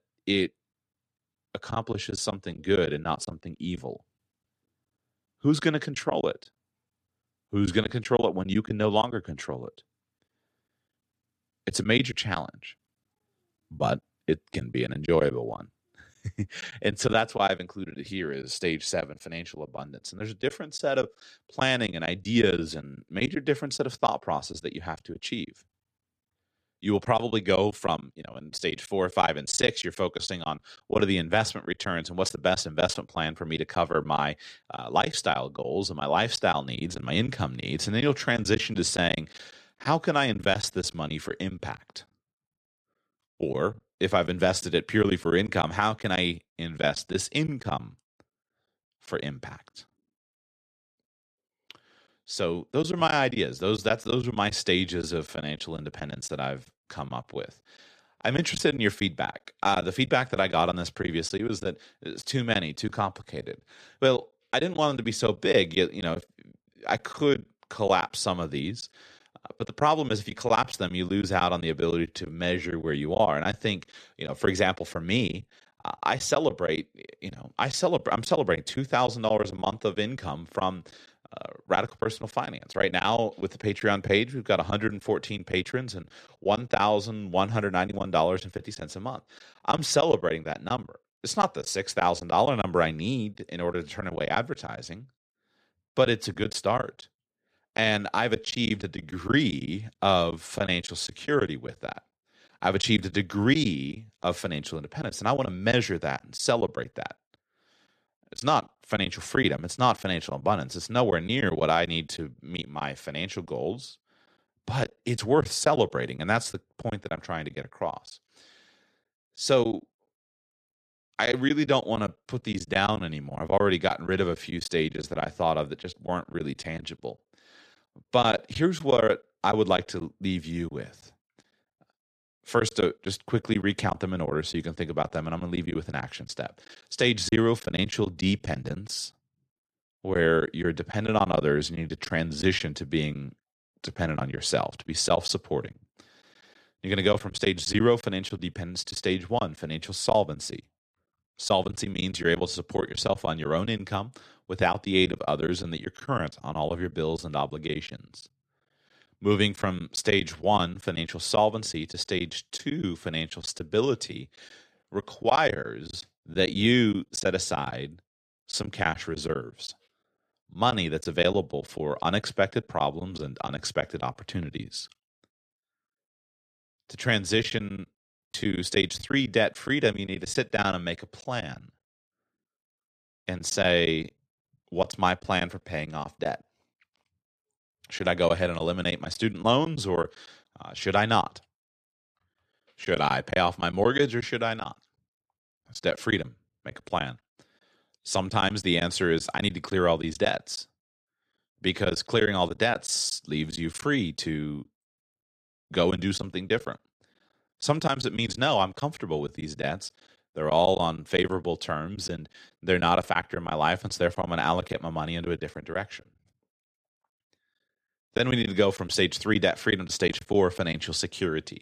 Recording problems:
choppy; very; 7% of the speech affected

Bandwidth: 14 kHz